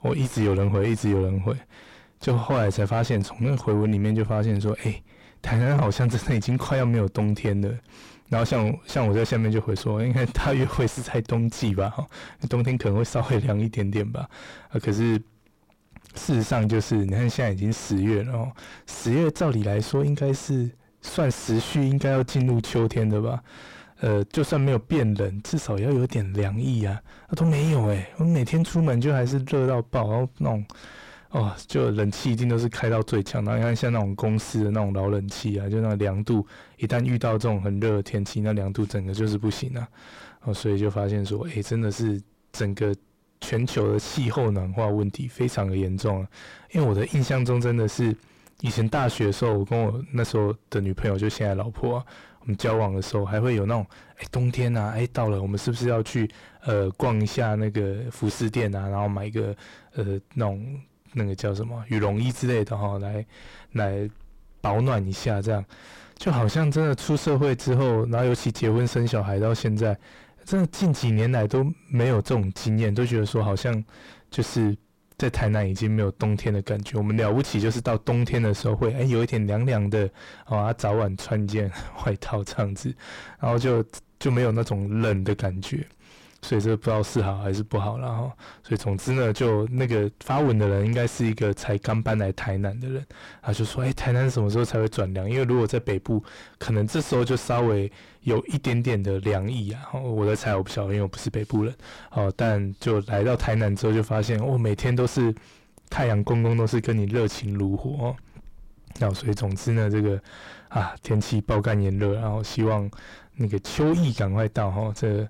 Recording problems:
distortion; heavy; 5 dB below the speech

